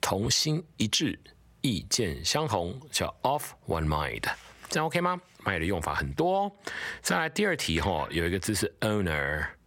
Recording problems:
squashed, flat; heavily

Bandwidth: 16.5 kHz